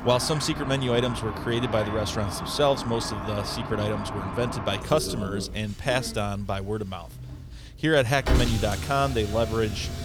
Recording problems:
traffic noise; loud; throughout; 6 dB below the speech

